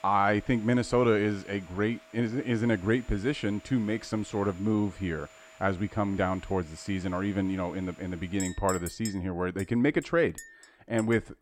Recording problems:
household noises; noticeable; throughout; 20 dB below the speech

